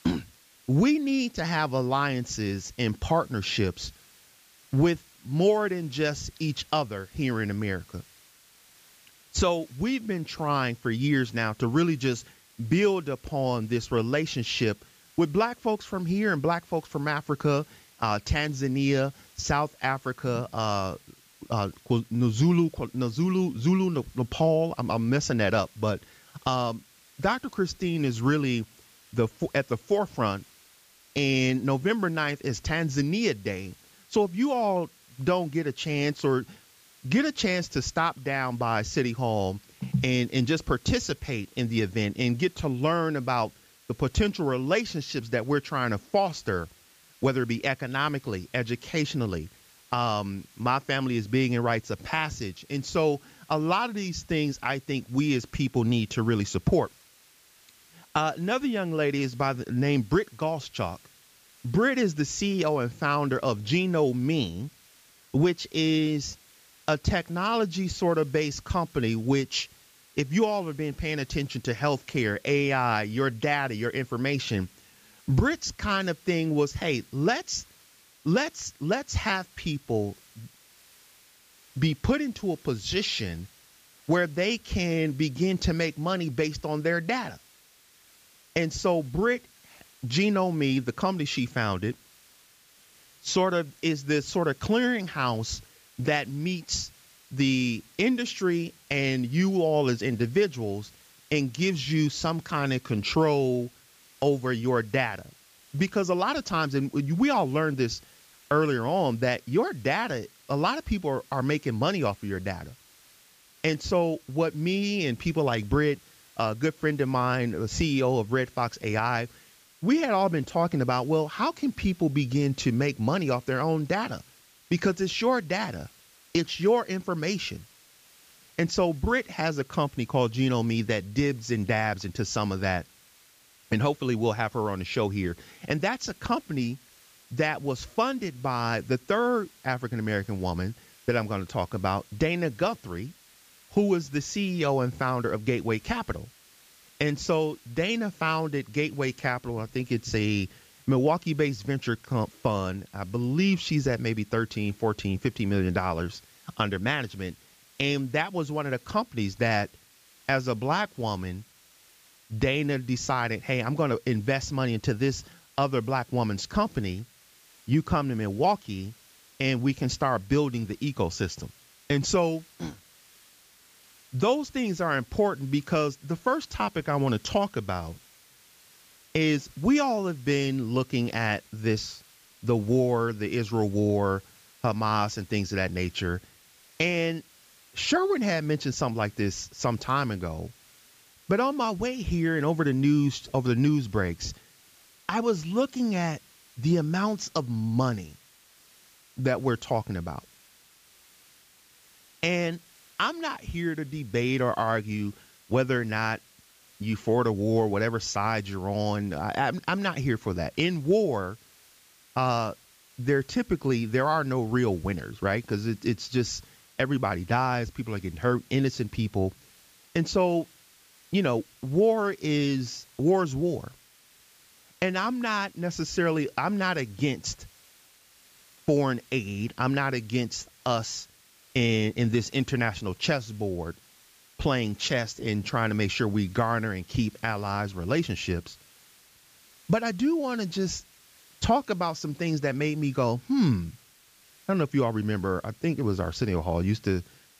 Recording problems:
high frequencies cut off; noticeable; nothing above 8 kHz
hiss; faint; throughout; 25 dB below the speech

